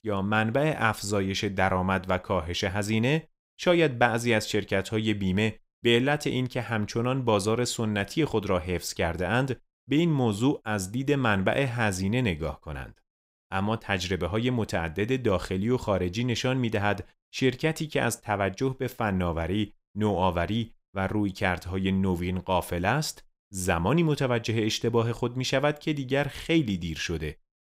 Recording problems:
none

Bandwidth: 15.5 kHz